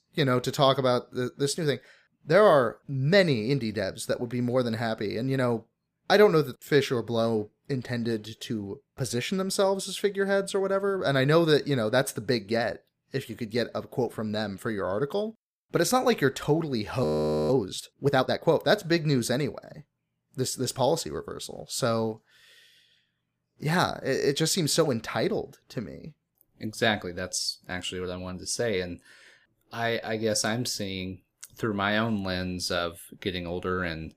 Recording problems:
audio freezing; at 17 s

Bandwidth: 15 kHz